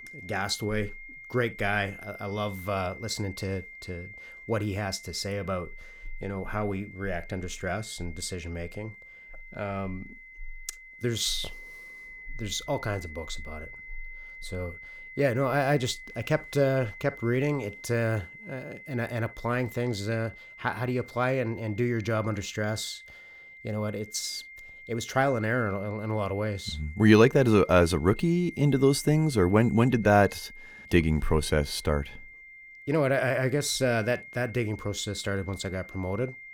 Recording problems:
high-pitched whine; noticeable; throughout; 2 kHz, 15 dB below the speech

